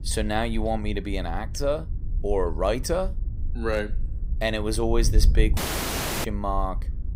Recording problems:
wind noise on the microphone; occasional gusts; 20 dB below the speech
audio cutting out; at 5.5 s for 0.5 s

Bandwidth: 15.5 kHz